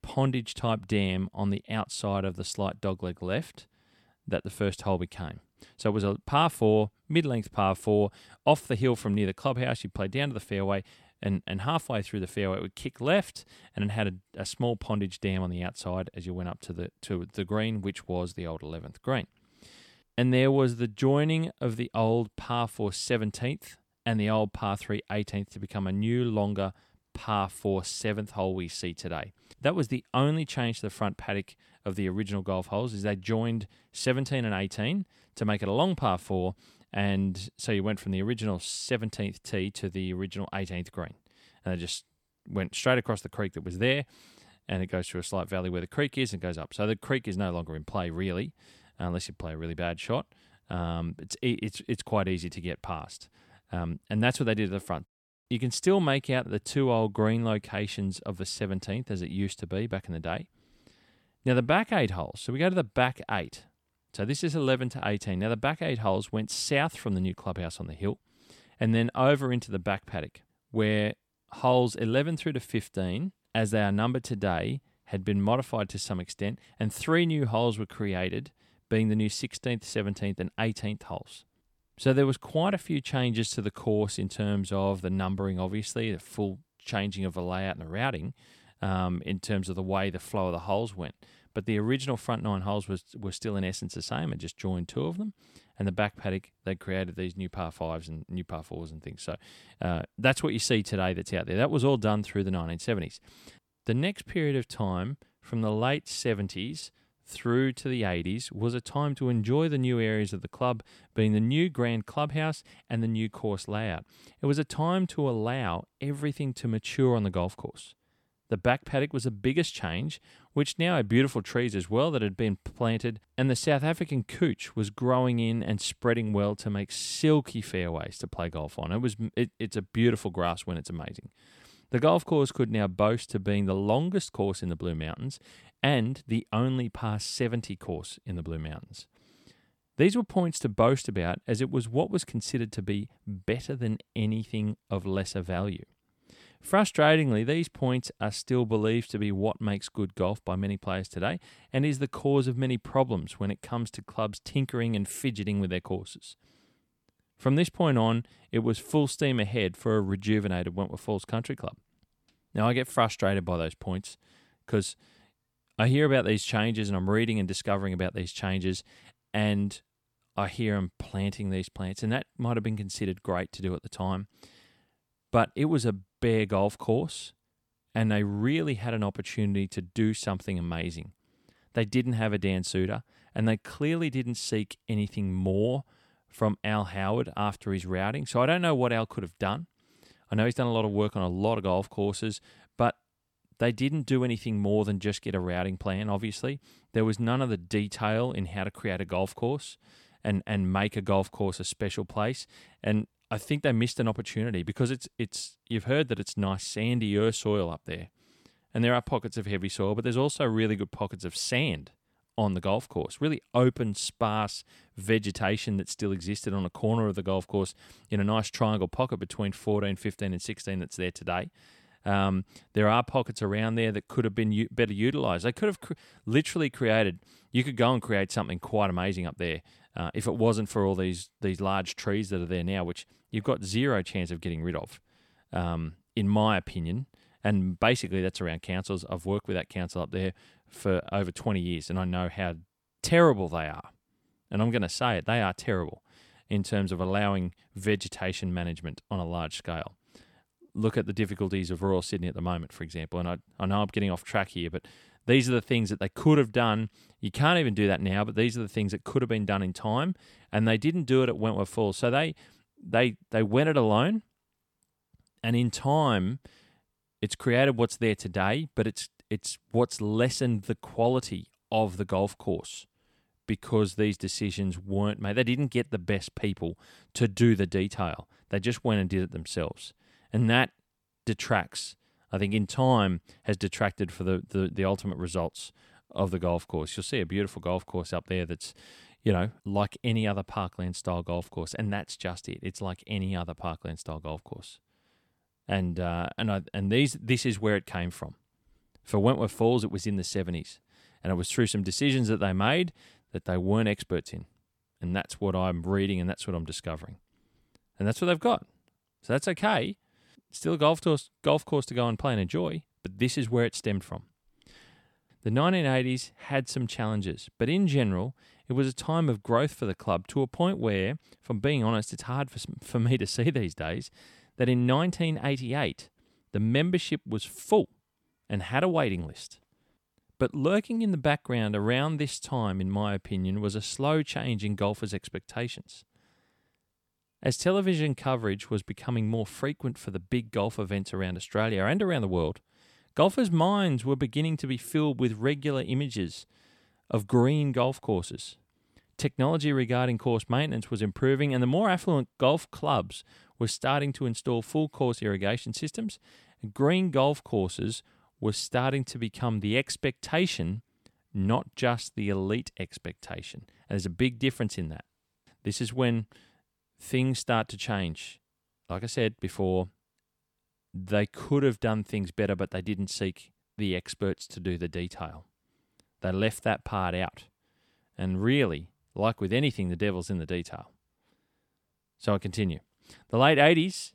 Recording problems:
none

